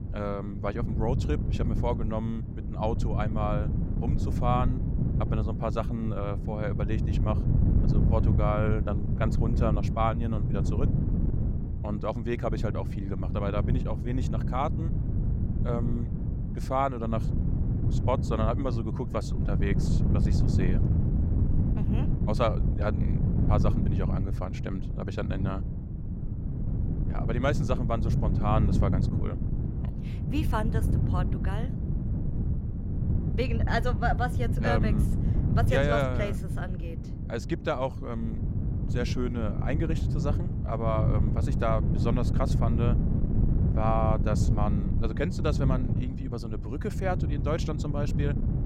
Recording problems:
wind noise on the microphone; heavy; 7 dB below the speech

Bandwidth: 16 kHz